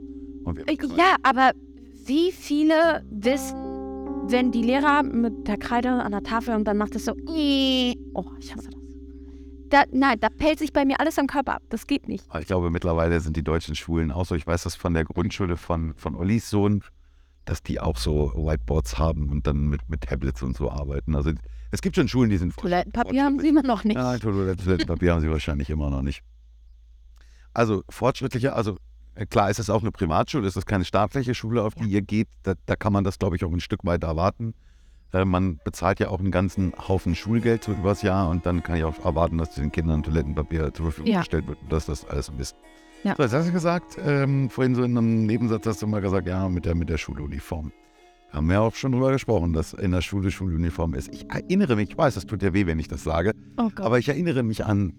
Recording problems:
background music; noticeable; throughout; 15 dB below the speech

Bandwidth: 18.5 kHz